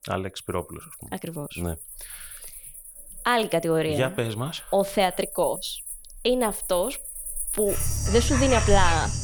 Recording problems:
animal sounds; loud; throughout; 5 dB below the speech

